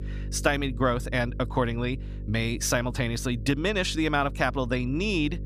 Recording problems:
electrical hum; faint; throughout; 50 Hz, 20 dB below the speech

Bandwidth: 15 kHz